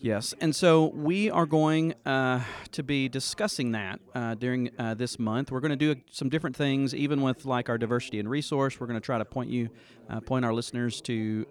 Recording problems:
background chatter; faint; throughout; 3 voices, 25 dB below the speech

